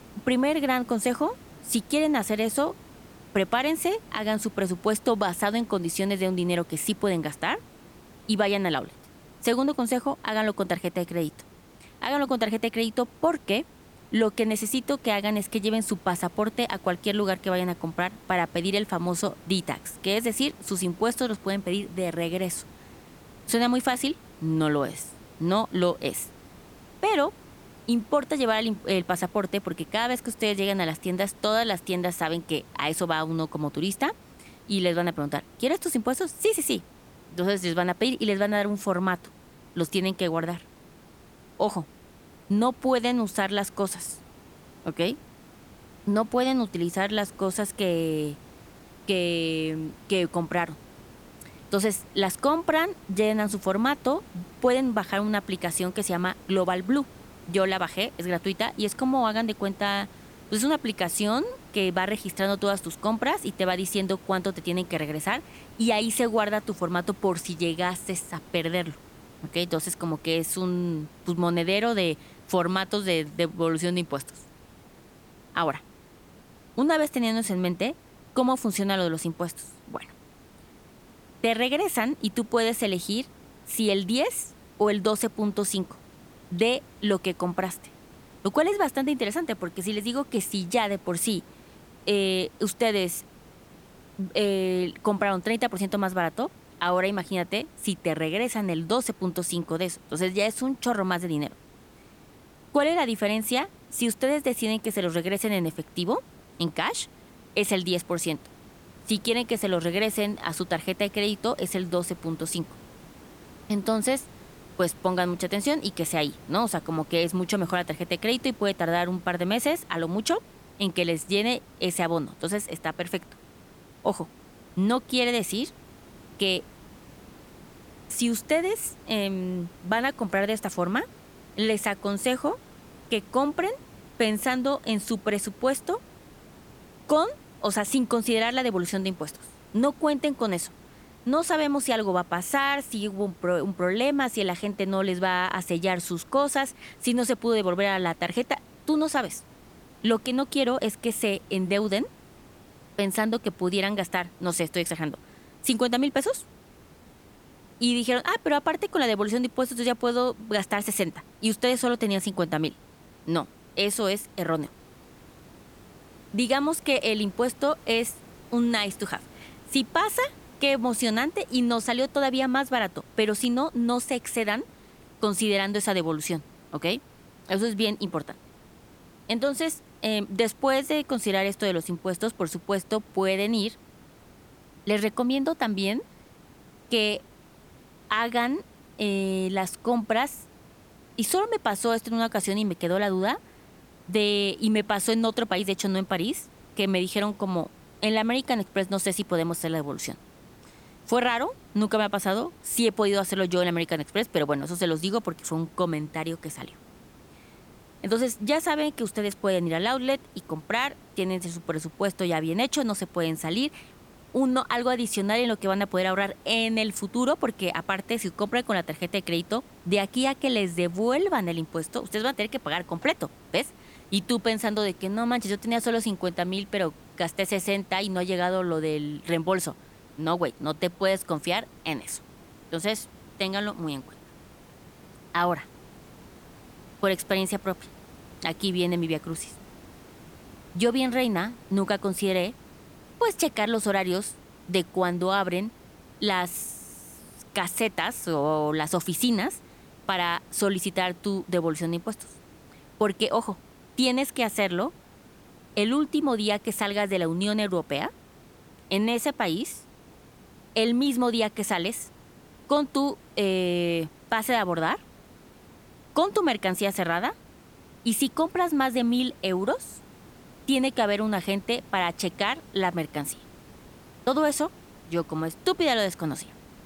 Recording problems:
hiss; faint; throughout; 25 dB below the speech

